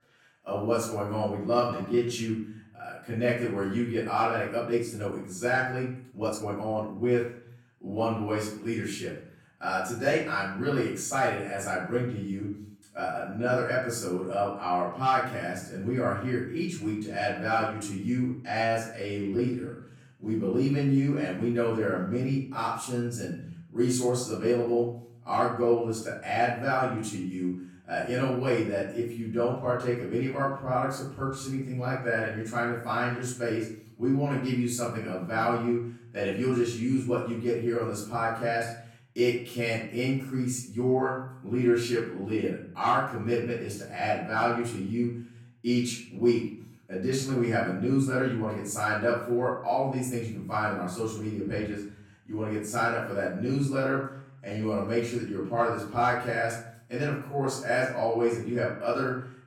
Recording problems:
off-mic speech; far
room echo; noticeable; dies away in 0.6 s
uneven, jittery; strongly; from 1.5 to 55 s

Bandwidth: 17 kHz